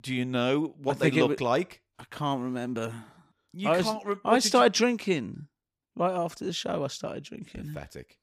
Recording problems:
none

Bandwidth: 15 kHz